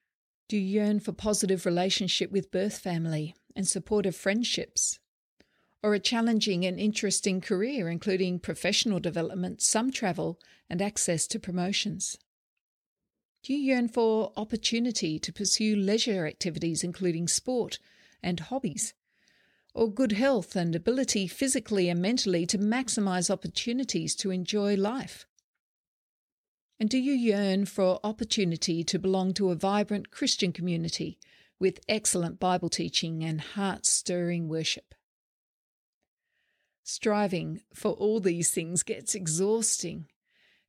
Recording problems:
uneven, jittery; slightly; from 4.5 to 39 s

